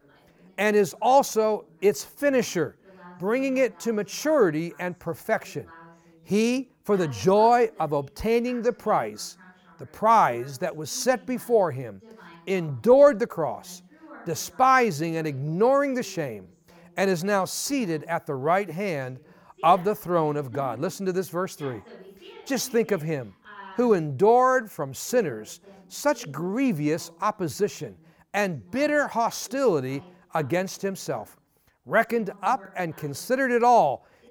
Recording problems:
voice in the background; faint; throughout; 25 dB below the speech

